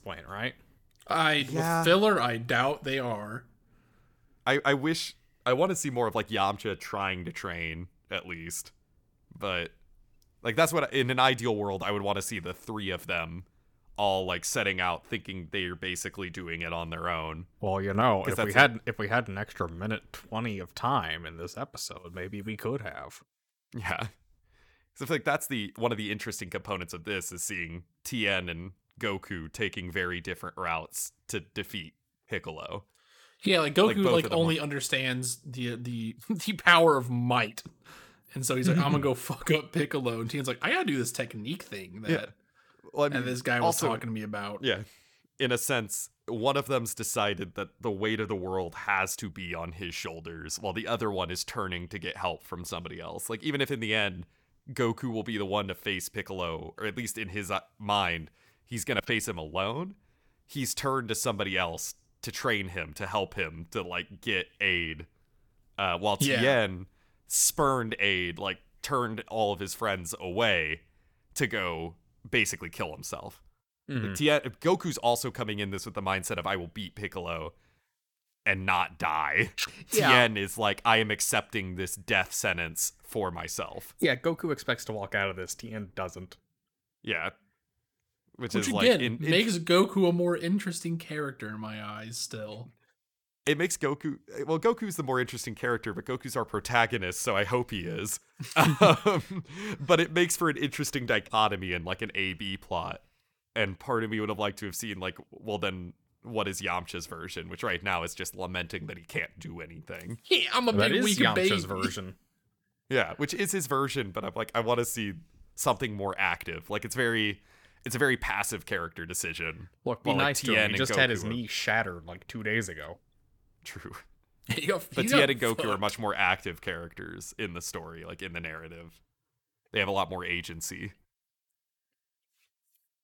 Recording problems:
none

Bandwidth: 18.5 kHz